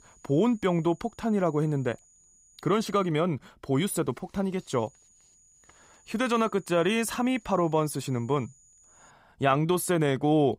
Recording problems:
high-pitched whine; faint; until 3 s and from 4.5 to 9 s; 7 kHz, 30 dB below the speech

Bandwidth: 15.5 kHz